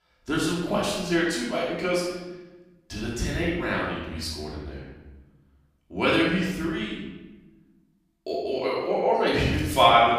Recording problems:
off-mic speech; far
room echo; noticeable; dies away in 1.1 s

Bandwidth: 15 kHz